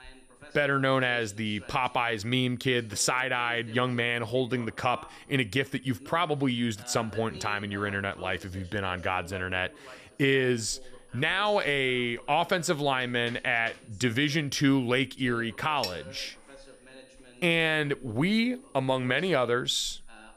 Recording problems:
high-pitched whine; faint; throughout; 9.5 kHz, 35 dB below the speech
voice in the background; faint; throughout; 20 dB below the speech

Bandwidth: 15 kHz